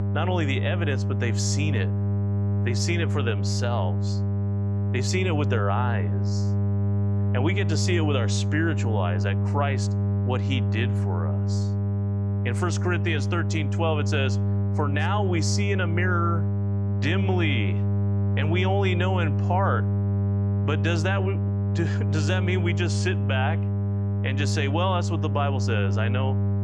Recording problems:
electrical hum; loud; throughout; 50 Hz, 7 dB below the speech

